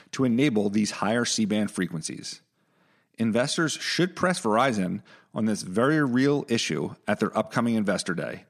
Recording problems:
none

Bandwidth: 14.5 kHz